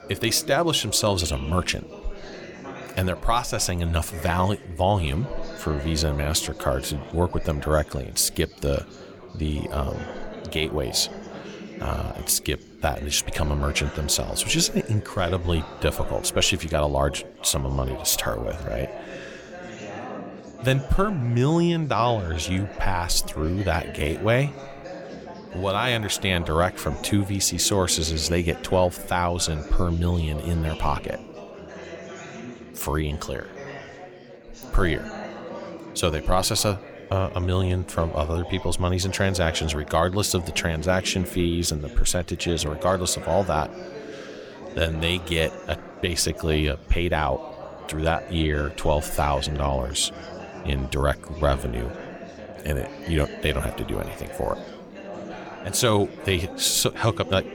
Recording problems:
chatter from many people; noticeable; throughout; 15 dB below the speech

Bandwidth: 17.5 kHz